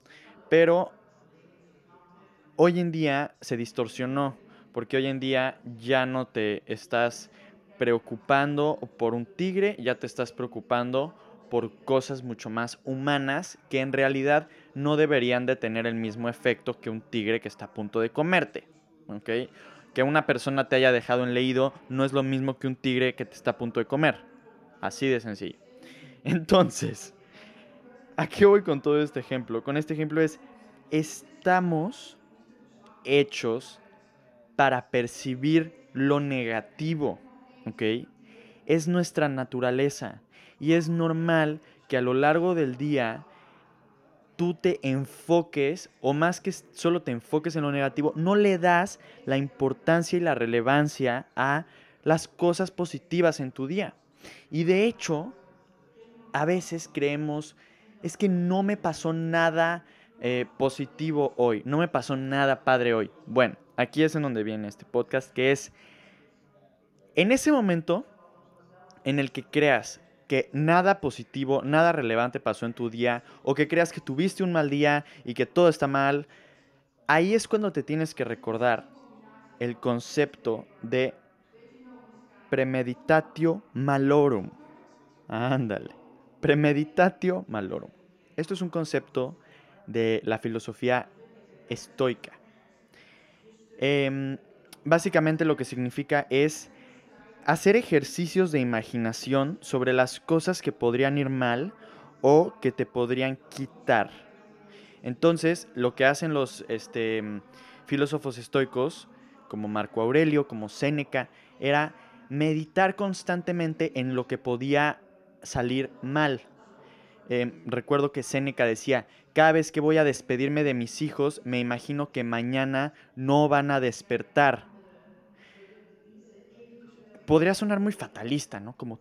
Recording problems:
background chatter; faint; throughout; 4 voices, 30 dB below the speech

